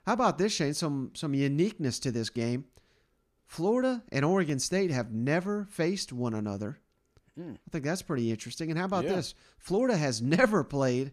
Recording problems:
none

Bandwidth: 14.5 kHz